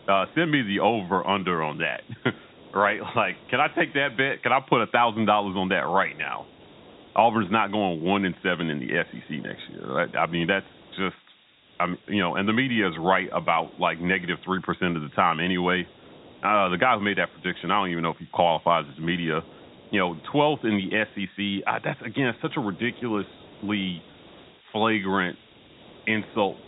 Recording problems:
high frequencies cut off; severe; nothing above 4 kHz
hiss; faint; throughout; 25 dB below the speech

